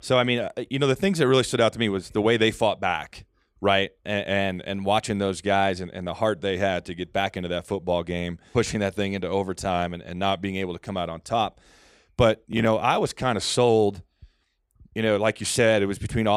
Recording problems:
abrupt cut into speech; at the end

